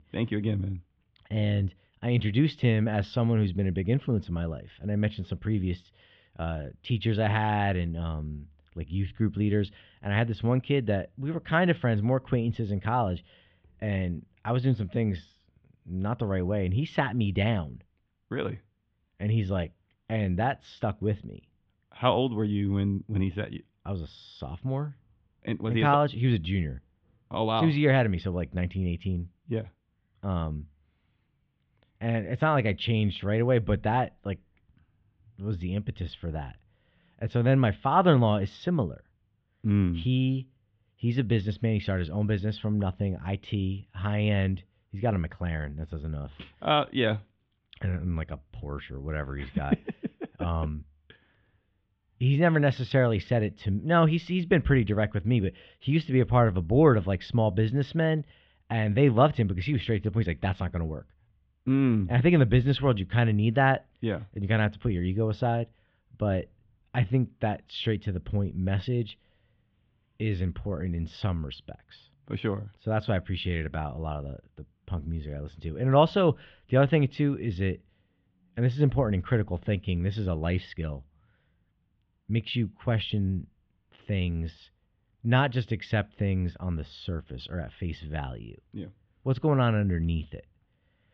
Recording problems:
muffled; very; fading above 3.5 kHz

